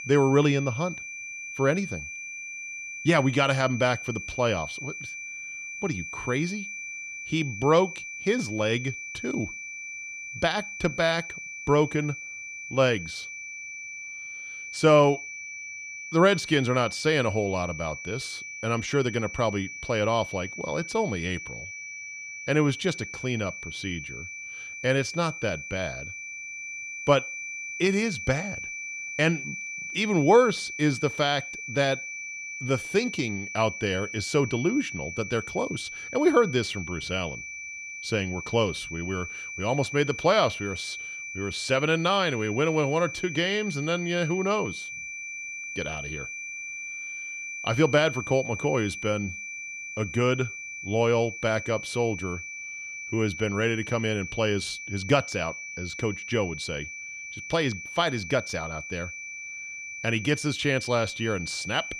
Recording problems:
high-pitched whine; loud; throughout; 2.5 kHz, 9 dB below the speech

